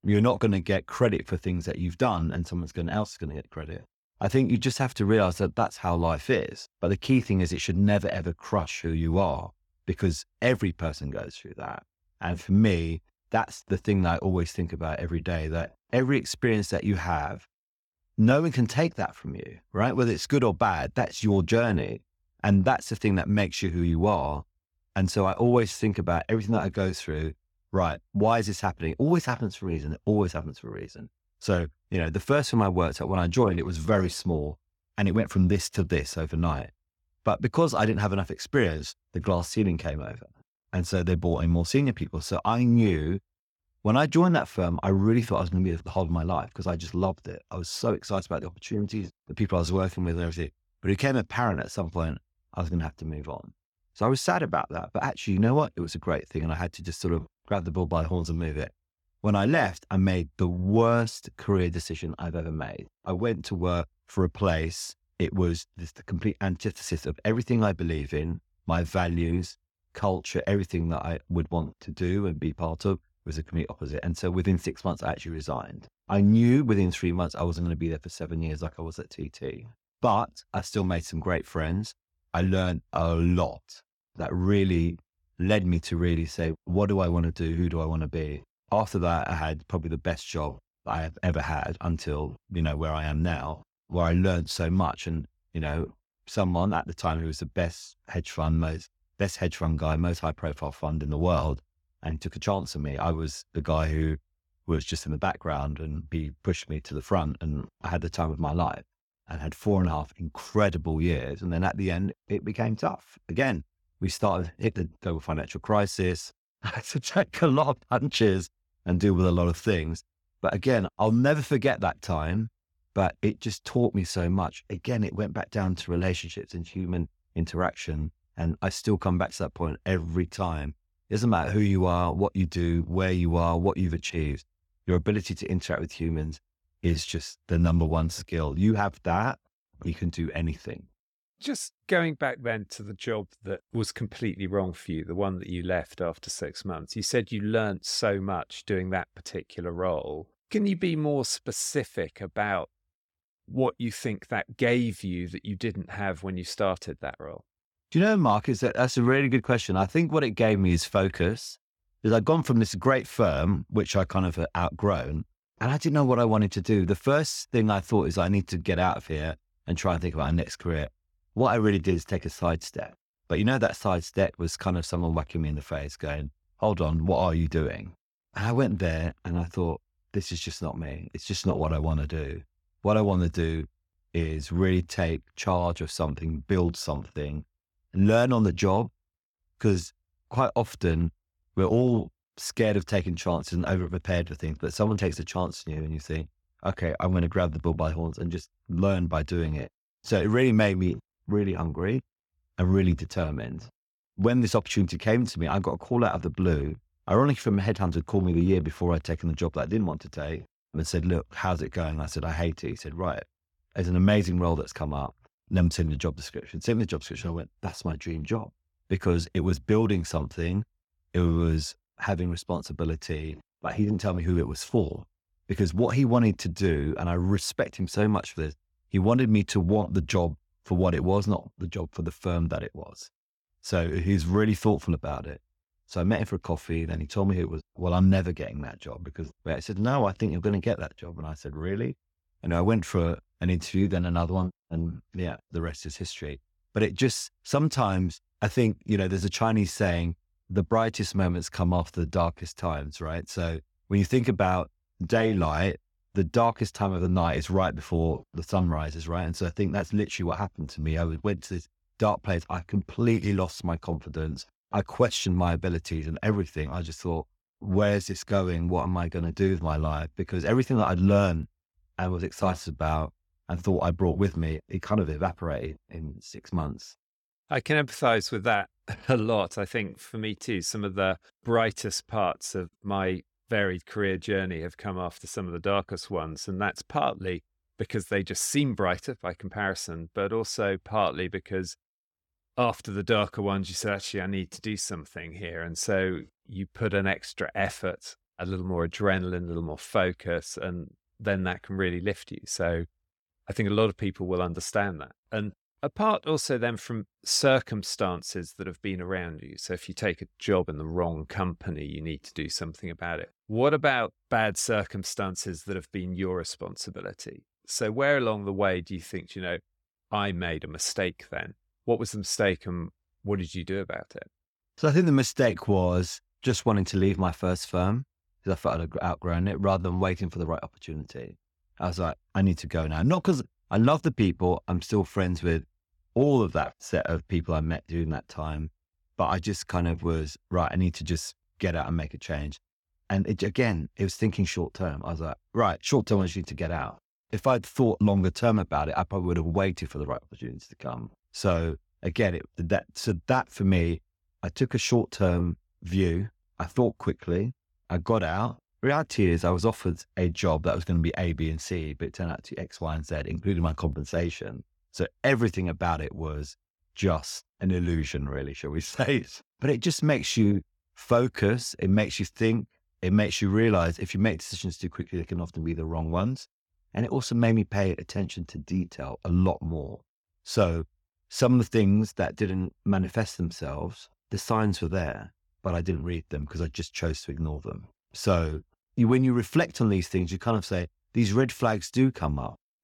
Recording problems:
none

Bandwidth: 17 kHz